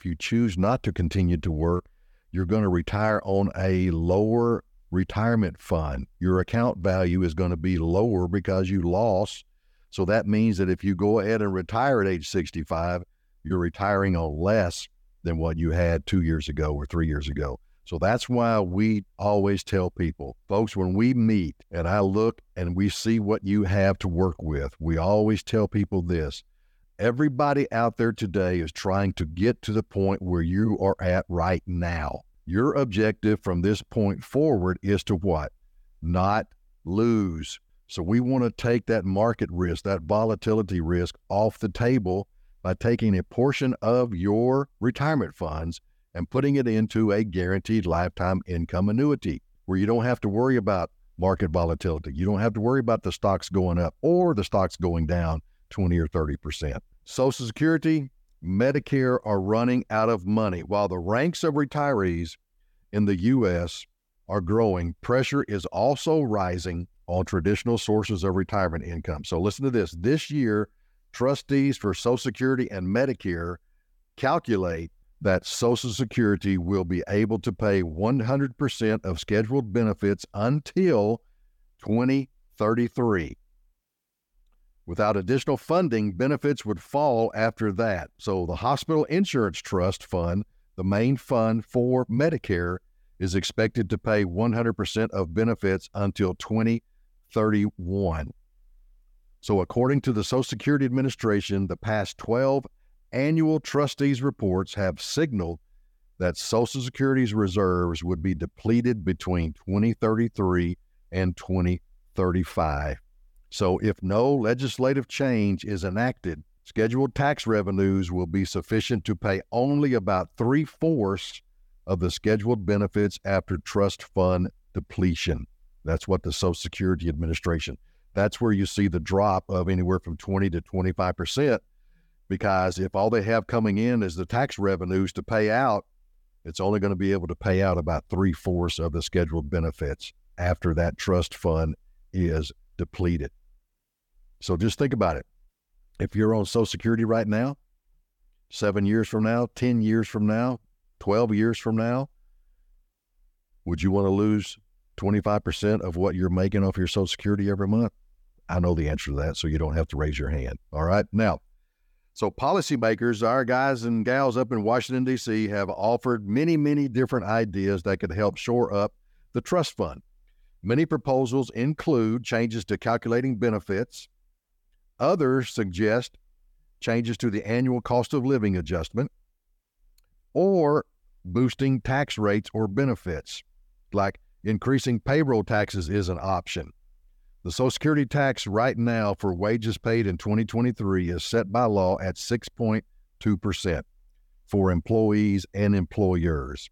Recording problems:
none

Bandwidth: 18 kHz